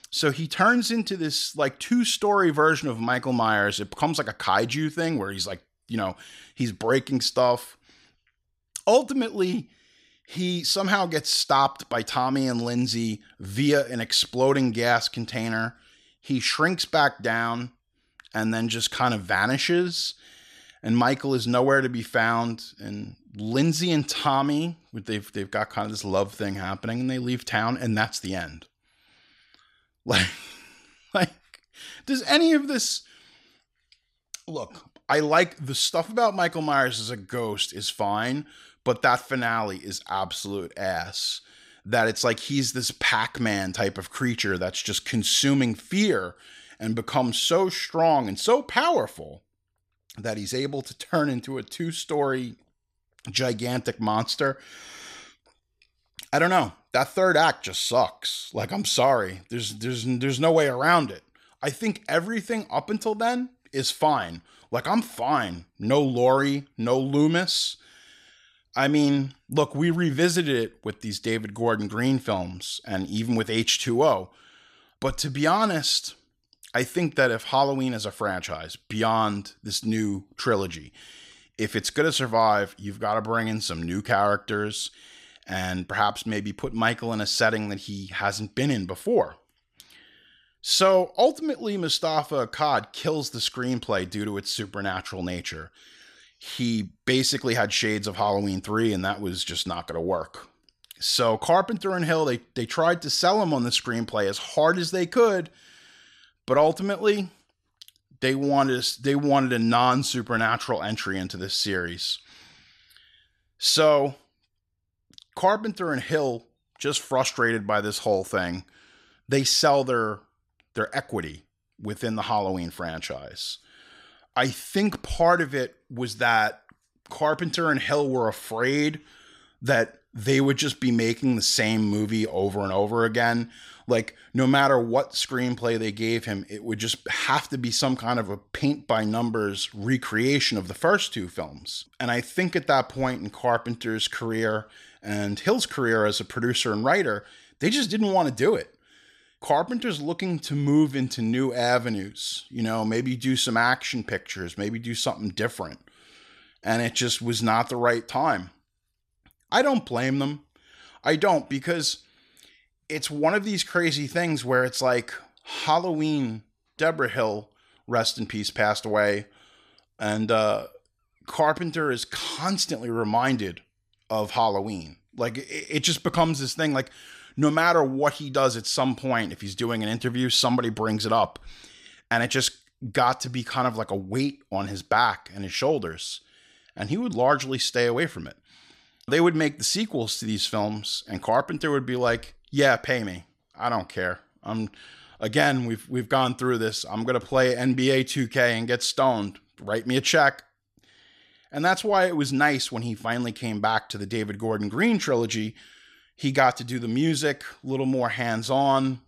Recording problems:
none

